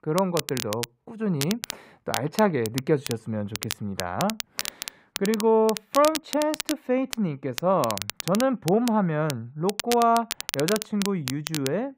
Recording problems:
muffled; slightly; fading above 3.5 kHz
crackle, like an old record; loud; 8 dB below the speech

